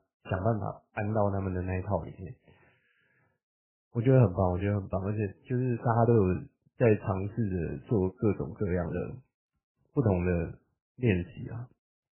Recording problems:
garbled, watery; badly; nothing above 3 kHz

